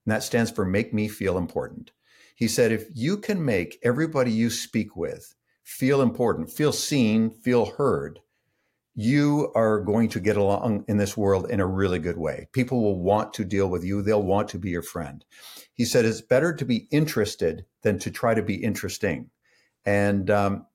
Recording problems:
none

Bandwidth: 16.5 kHz